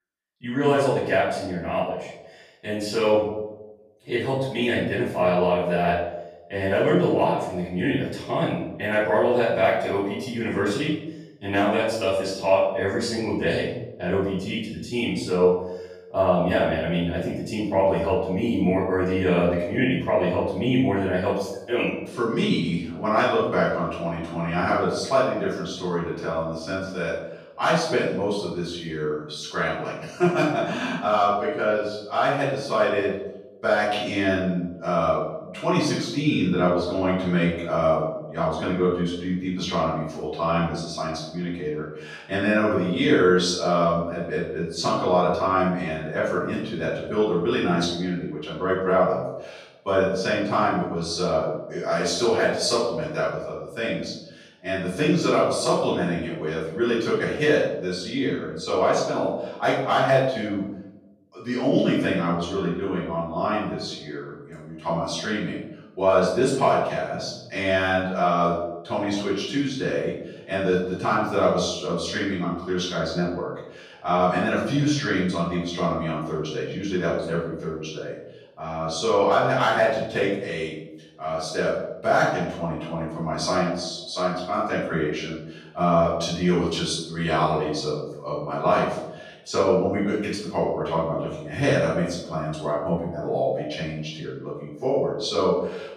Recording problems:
off-mic speech; far
room echo; noticeable; dies away in 0.8 s

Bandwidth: 15 kHz